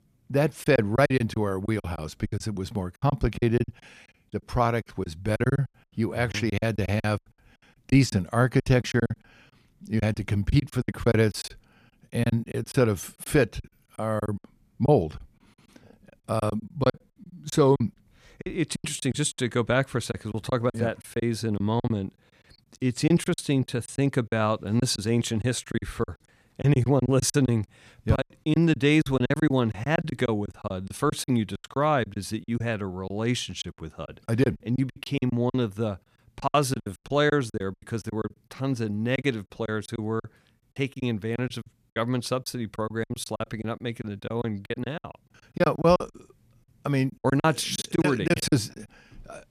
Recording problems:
choppy; very; 15% of the speech affected

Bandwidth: 14.5 kHz